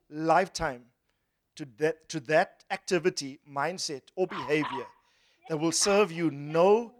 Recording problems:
animal sounds; noticeable; from 4 s on; 15 dB below the speech

